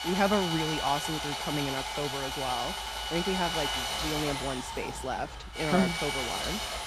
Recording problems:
machinery noise; very loud; throughout; as loud as the speech

